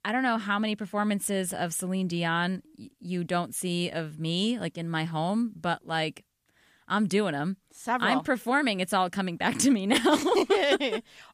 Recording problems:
none

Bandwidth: 15 kHz